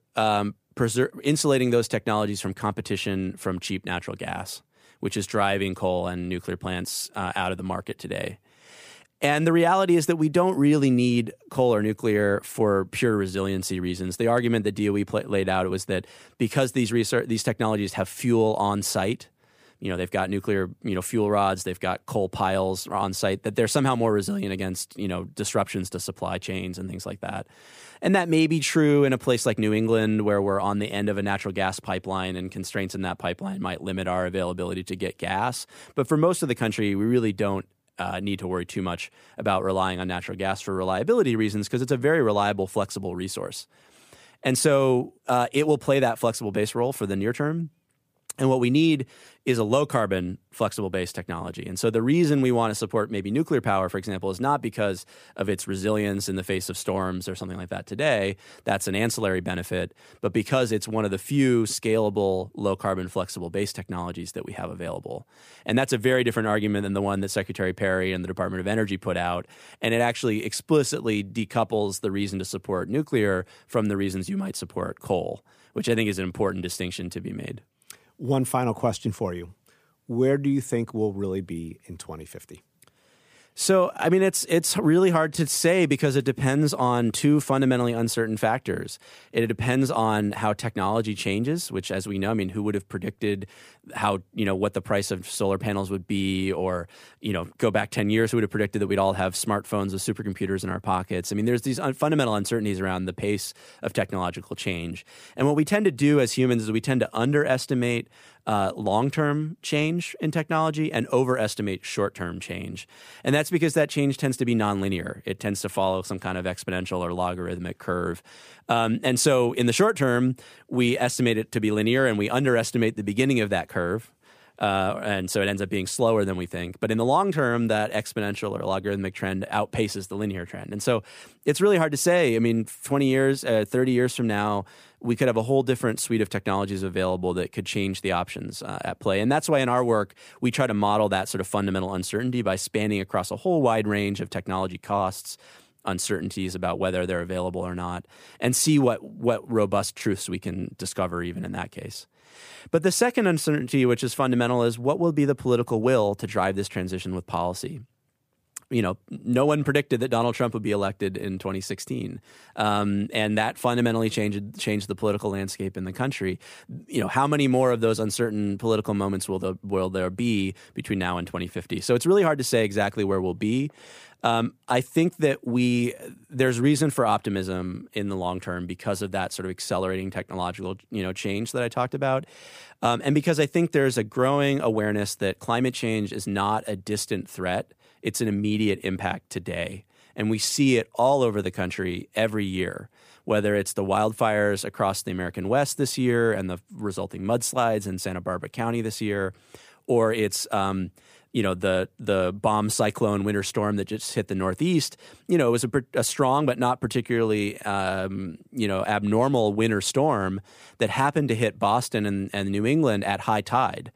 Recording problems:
none

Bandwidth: 15 kHz